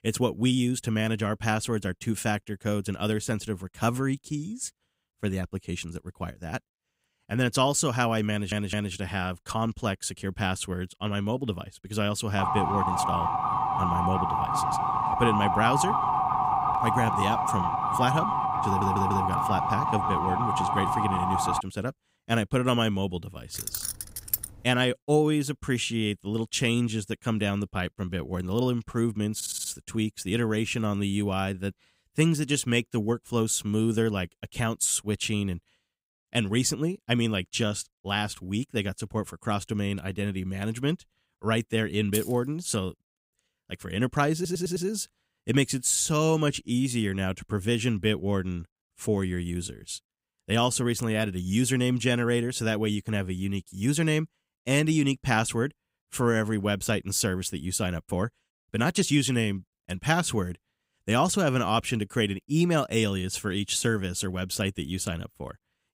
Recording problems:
audio stuttering; 4 times, first at 8.5 s
siren; loud; from 12 to 22 s; peak 3 dB above the speech
jangling keys; noticeable; at 24 s and at 42 s; peak 2 dB below the speech

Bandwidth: 15.5 kHz